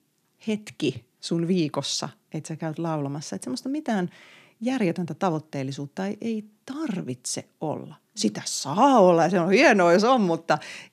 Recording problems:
none

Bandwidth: 14.5 kHz